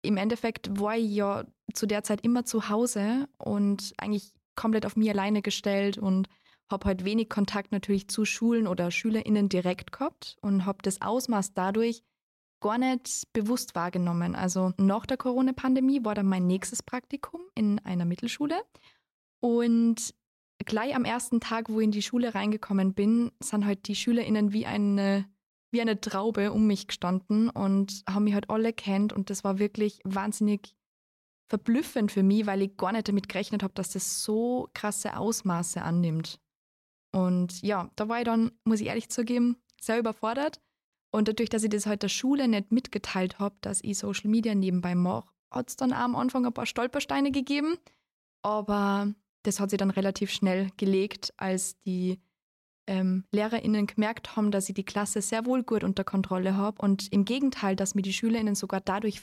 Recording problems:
none

